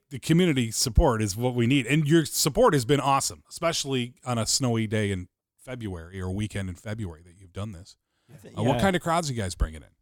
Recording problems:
none

